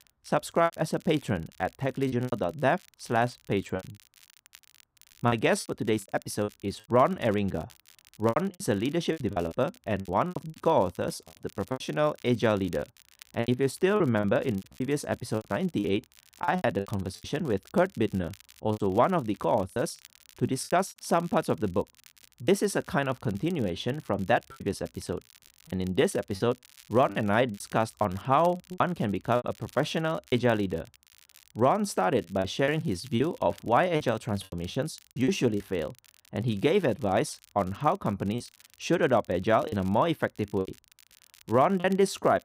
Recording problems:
crackle, like an old record; faint; 25 dB below the speech
choppy; very; 10% of the speech affected

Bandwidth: 15.5 kHz